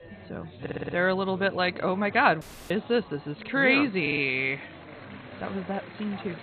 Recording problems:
garbled, watery; badly; nothing above 4 kHz
chatter from many people; noticeable; throughout; 20 dB below the speech
audio stuttering; at 0.5 s and at 4 s
audio cutting out; at 2.5 s

